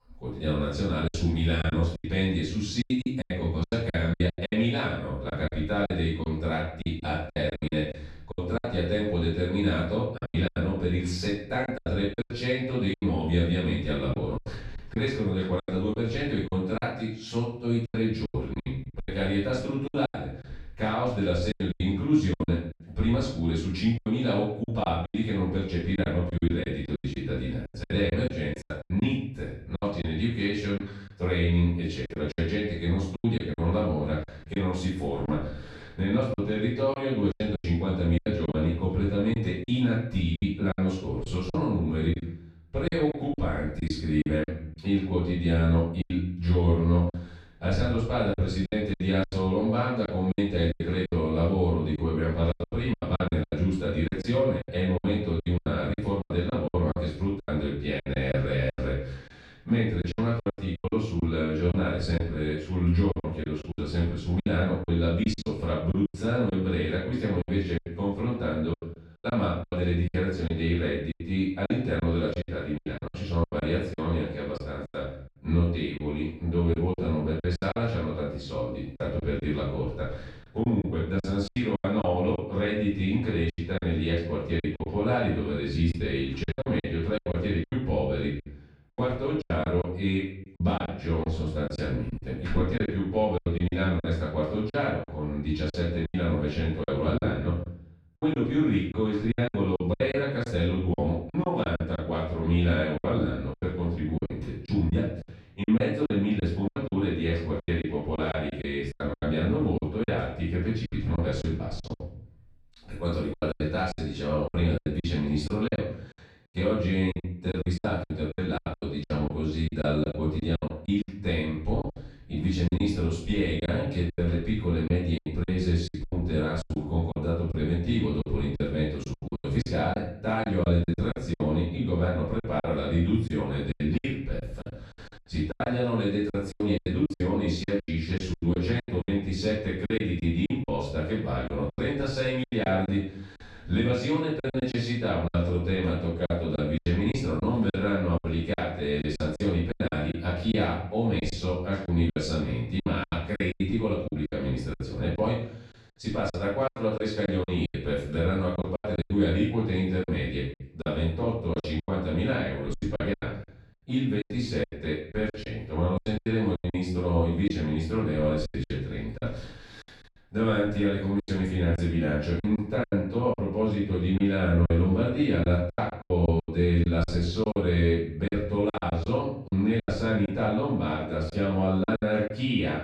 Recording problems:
off-mic speech; far
room echo; noticeable; dies away in 0.6 s
choppy; very; 12% of the speech affected

